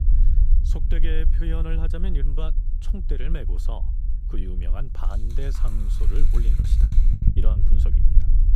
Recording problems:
low rumble; loud; throughout; 5 dB below the speech
rain or running water; noticeable; from 5 s on; 15 dB below the speech
choppy; very; at 6.5 s; 26% of the speech affected

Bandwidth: 15 kHz